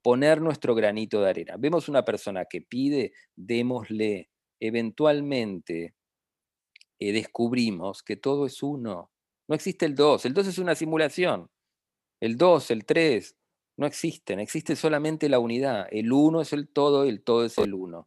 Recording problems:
none

